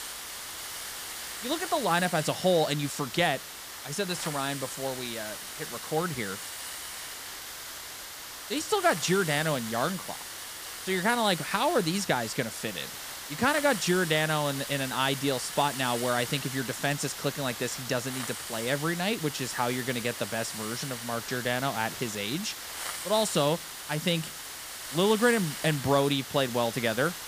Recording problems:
hiss; loud; throughout; 8 dB below the speech

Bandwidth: 15 kHz